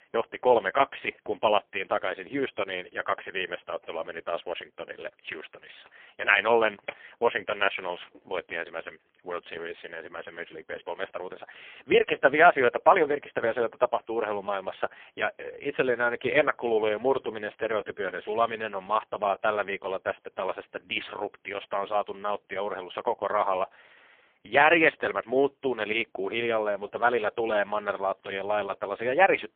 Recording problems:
phone-call audio; poor line; nothing above 3.5 kHz

